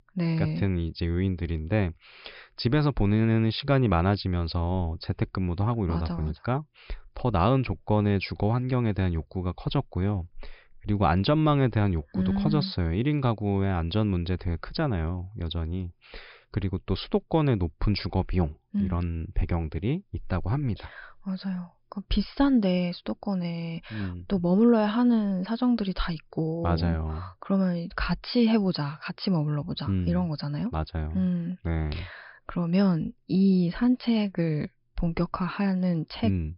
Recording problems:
high frequencies cut off; noticeable; nothing above 5.5 kHz

